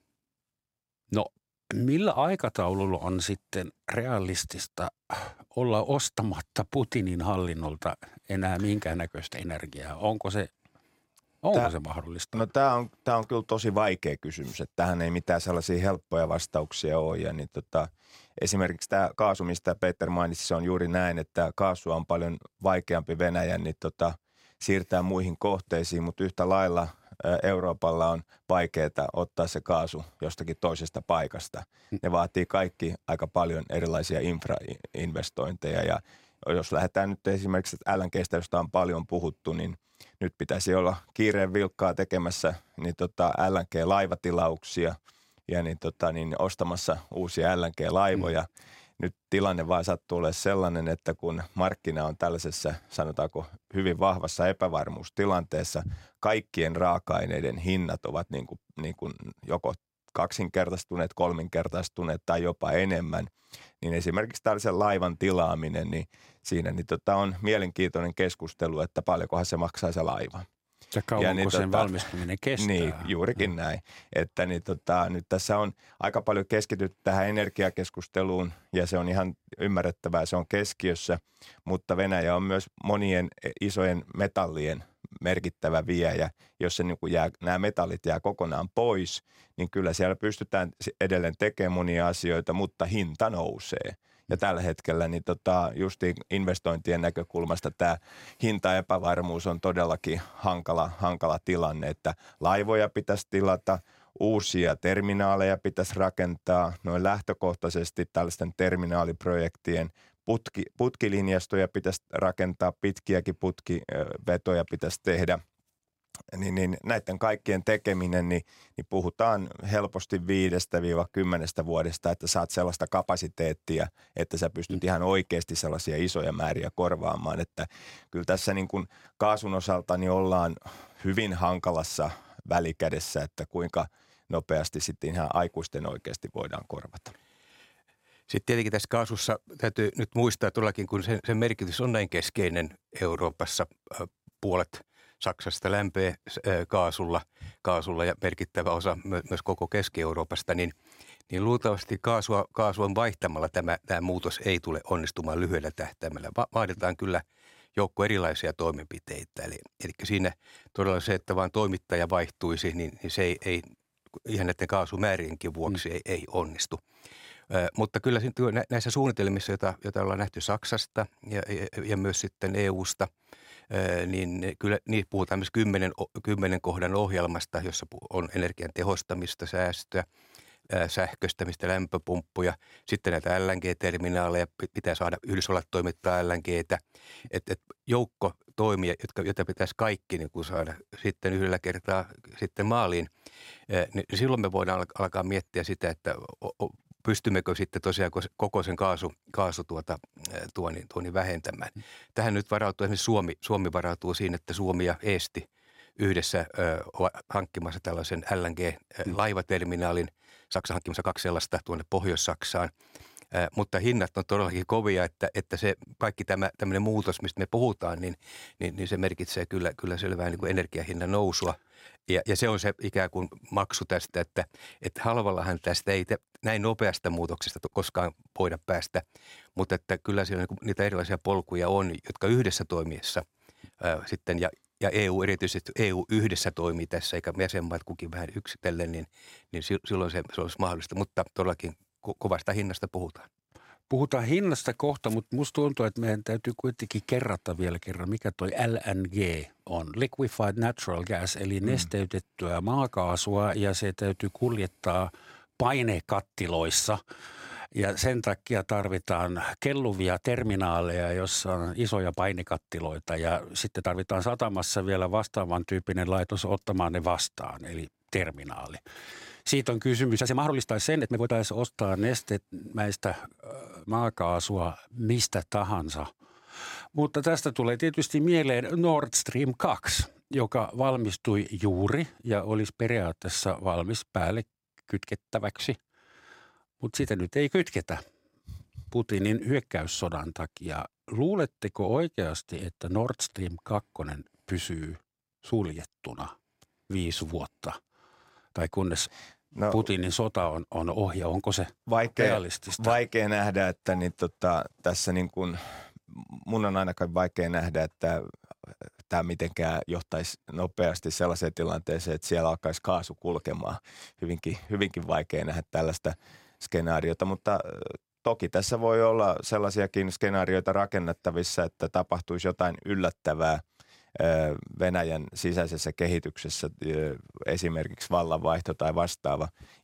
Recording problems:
uneven, jittery; strongly; from 19 s to 5:11

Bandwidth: 16 kHz